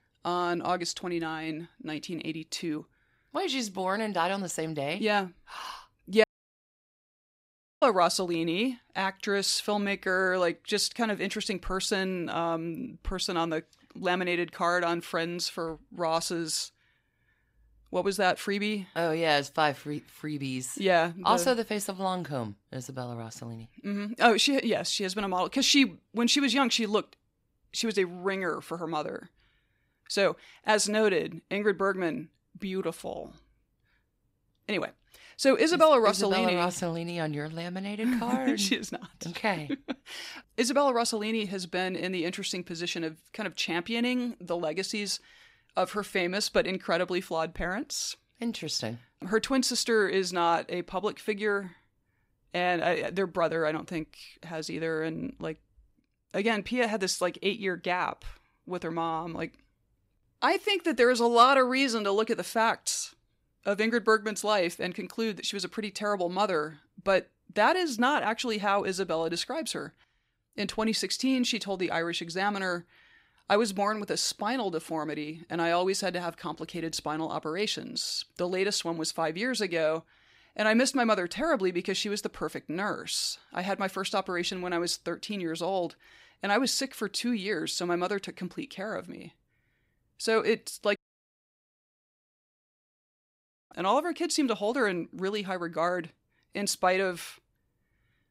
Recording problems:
audio cutting out; at 6 s for 1.5 s and at 1:31 for 3 s

